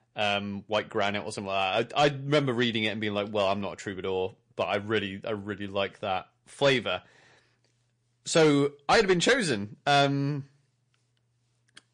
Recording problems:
distortion; slight; 2% of the sound clipped
garbled, watery; slightly; nothing above 9 kHz

